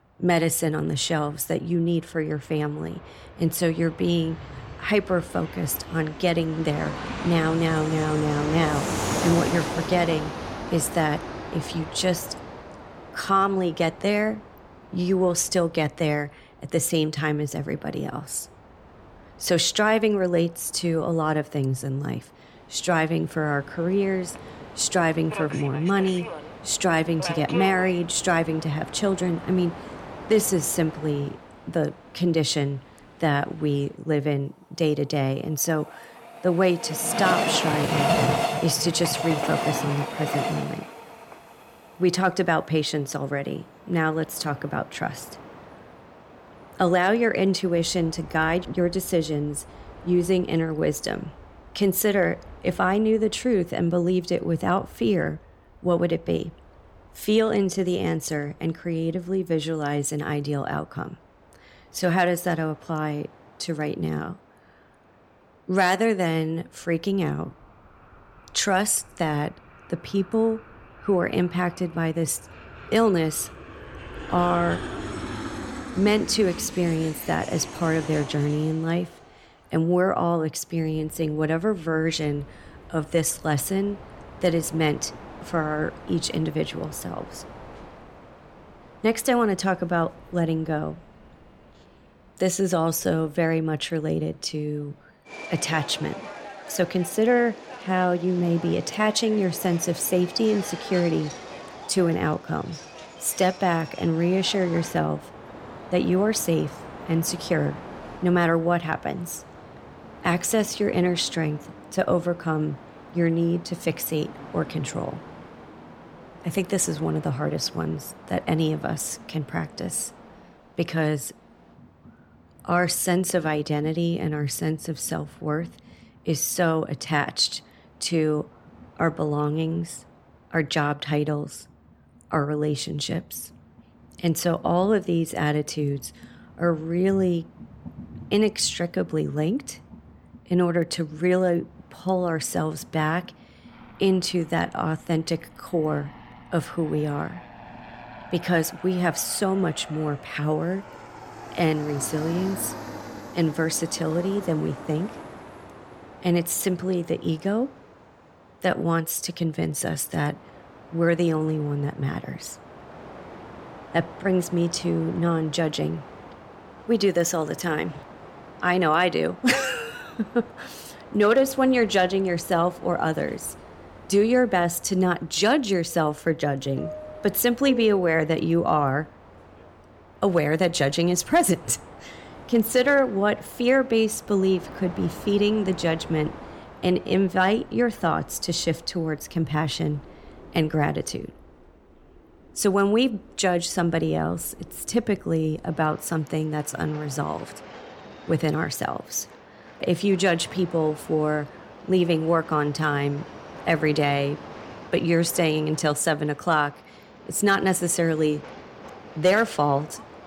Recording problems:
train or aircraft noise; noticeable; throughout; 15 dB below the speech

